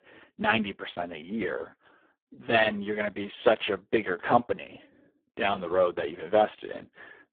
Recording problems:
phone-call audio; poor line

